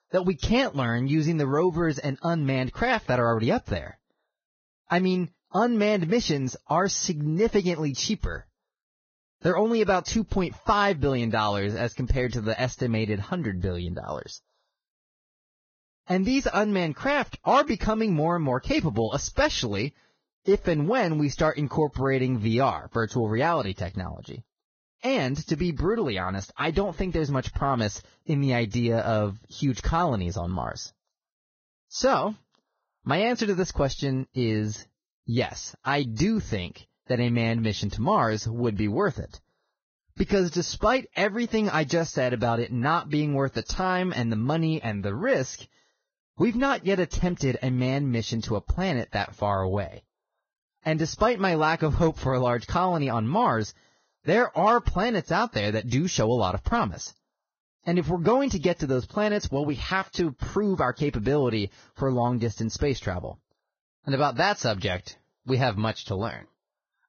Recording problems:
garbled, watery; badly; nothing above 6.5 kHz

